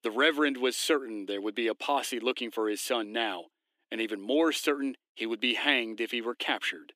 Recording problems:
thin; somewhat; fading below 300 Hz

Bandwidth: 15 kHz